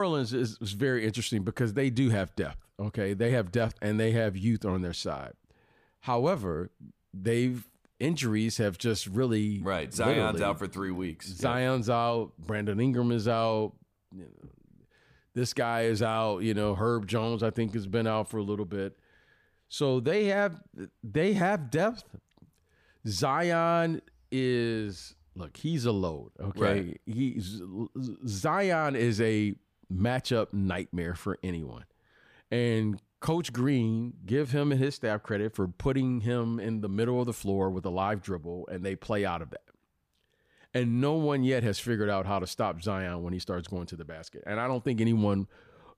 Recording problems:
abrupt cut into speech; at the start

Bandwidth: 15 kHz